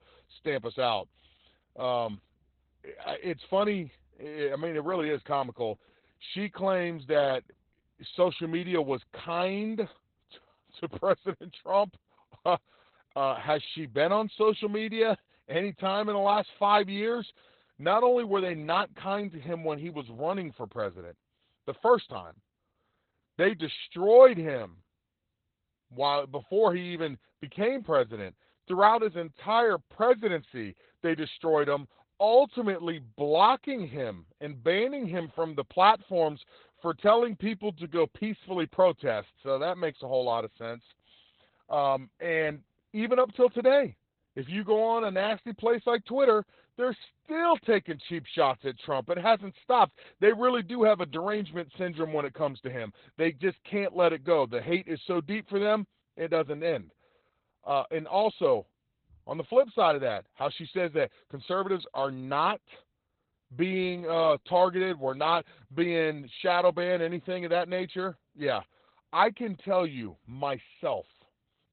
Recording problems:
garbled, watery; badly; nothing above 4 kHz

